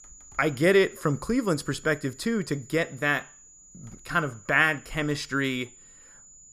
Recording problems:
high-pitched whine; faint; throughout; 7 kHz, 25 dB below the speech

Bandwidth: 14.5 kHz